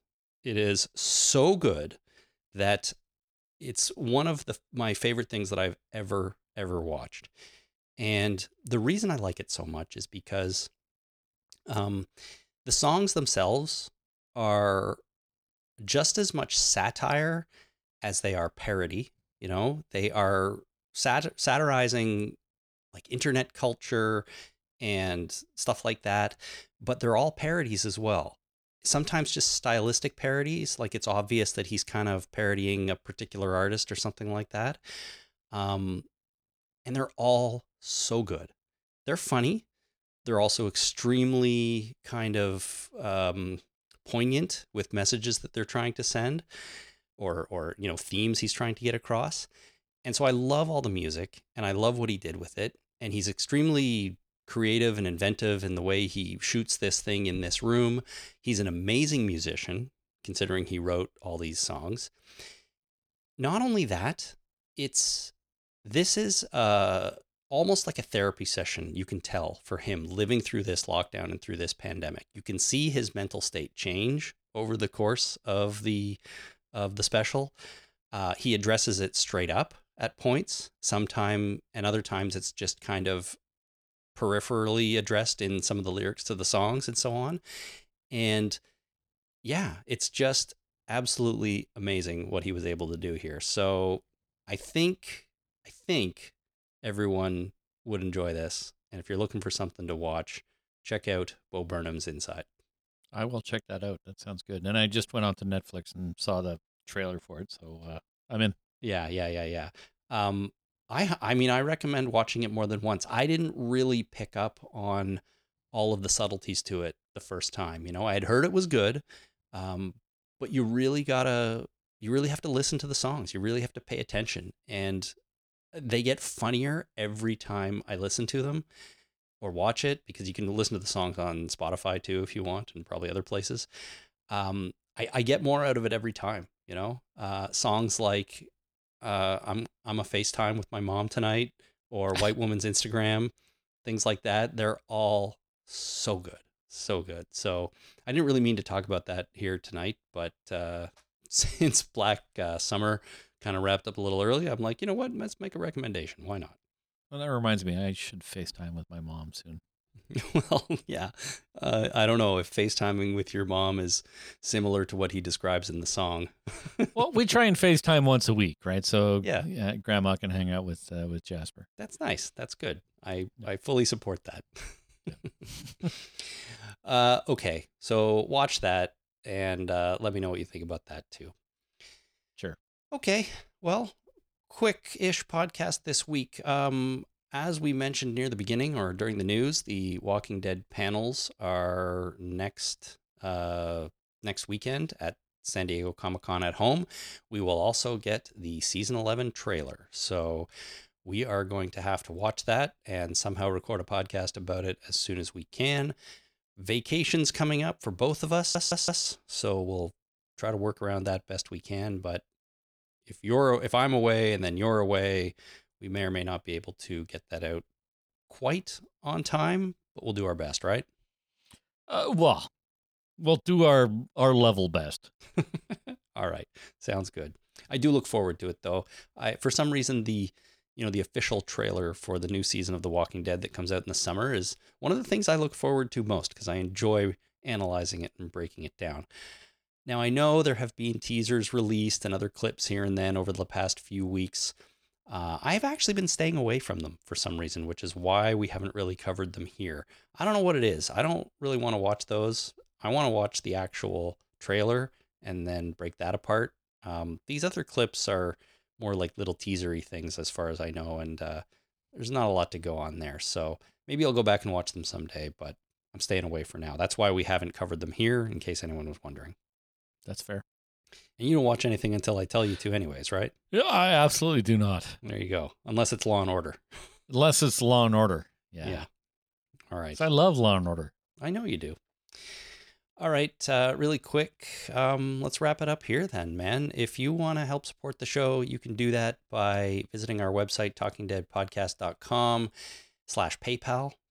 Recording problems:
audio stuttering; at 3:28

